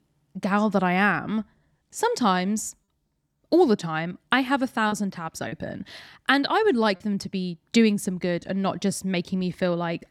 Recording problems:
choppy; occasionally; at 5 s; 2% of the speech affected

